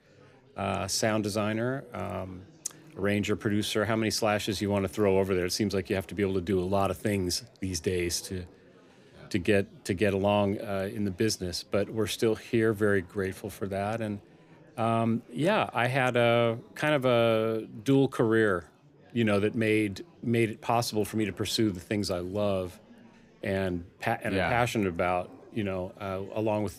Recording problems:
chatter from many people; faint; throughout; 25 dB below the speech

